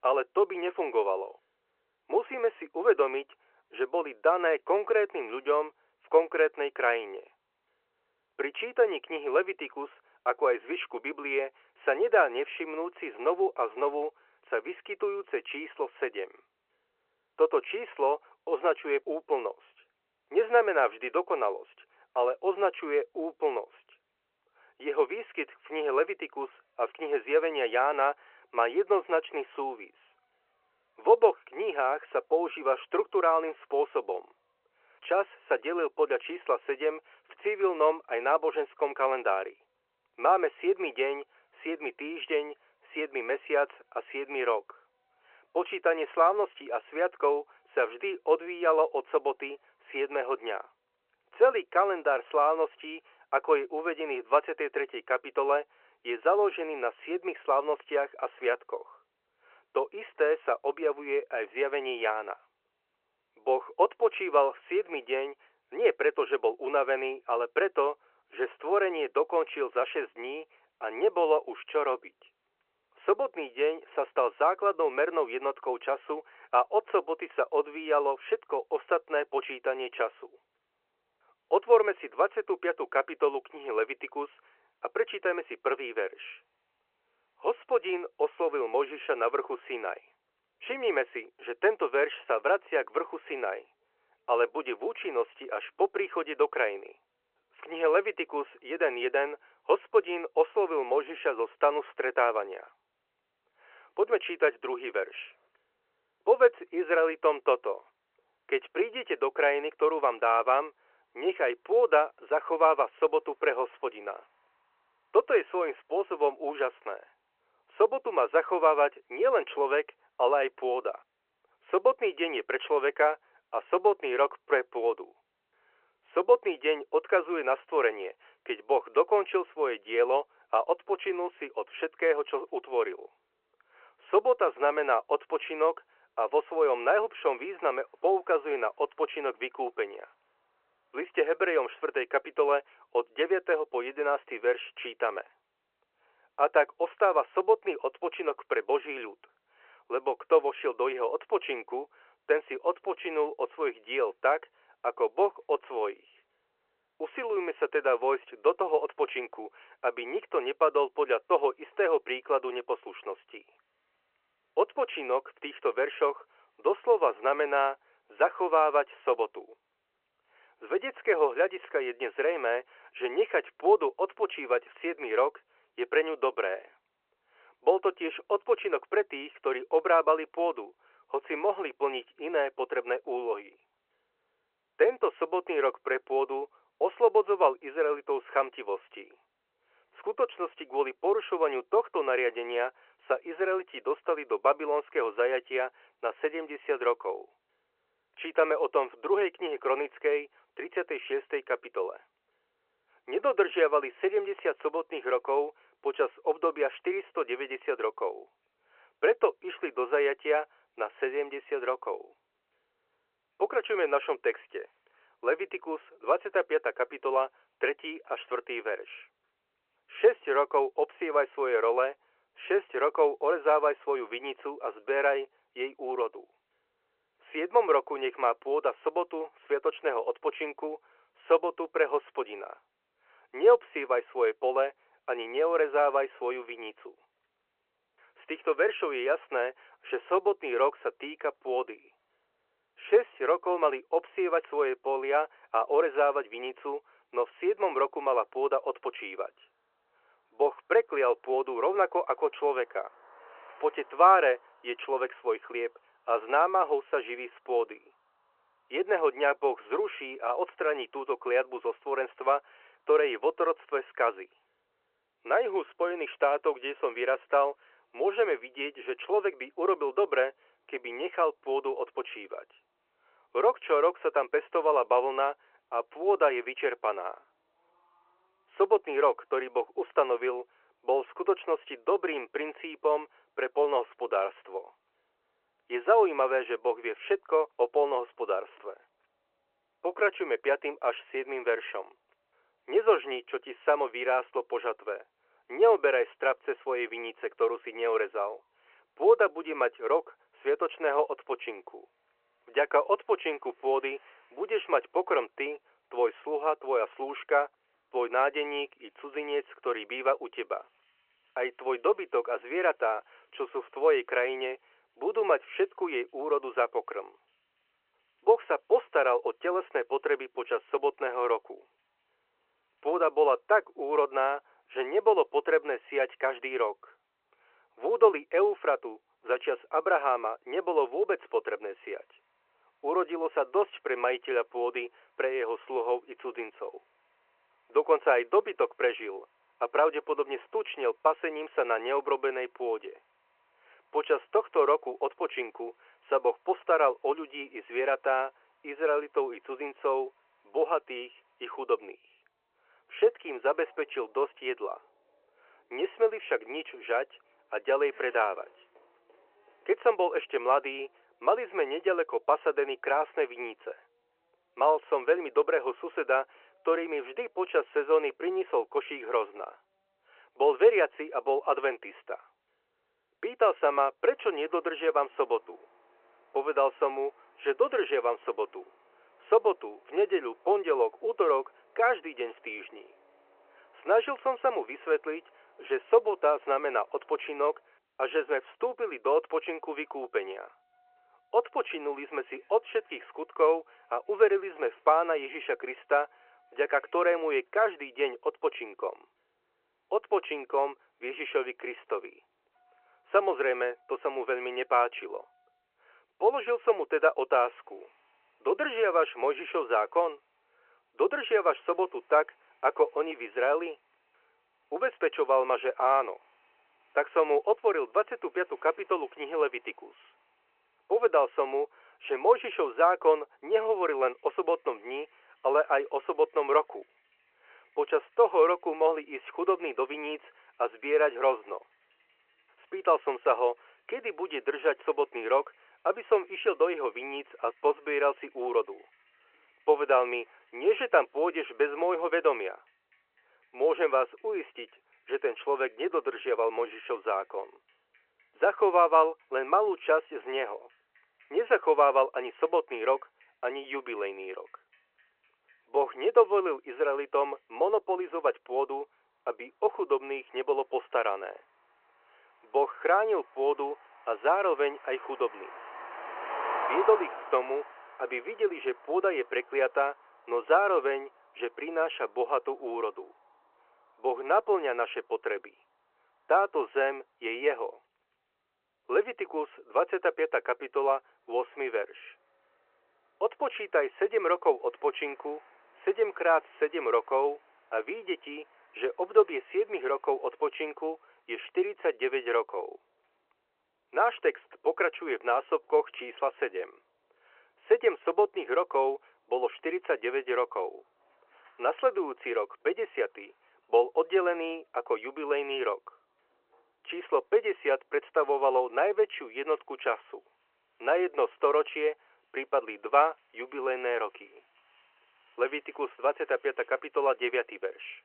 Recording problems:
phone-call audio
traffic noise; faint; throughout; 20 dB below the speech

